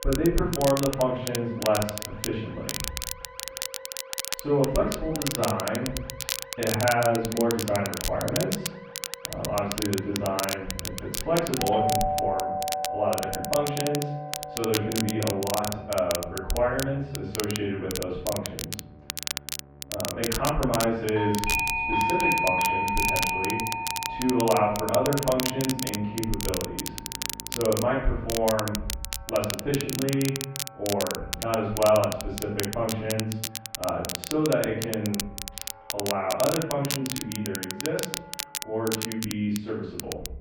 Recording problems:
off-mic speech; far
muffled; very; fading above 2.5 kHz
room echo; noticeable; dies away in 0.6 s
alarms or sirens; loud; throughout; 1 dB below the speech
crackle, like an old record; loud; 5 dB below the speech
background music; noticeable; throughout; 20 dB below the speech

